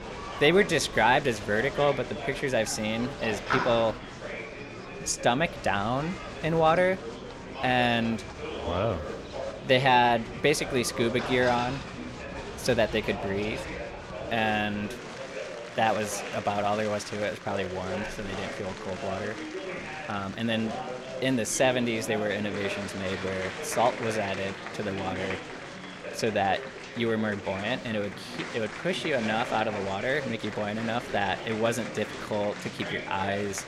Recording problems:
chatter from many people; loud; throughout; 8 dB below the speech

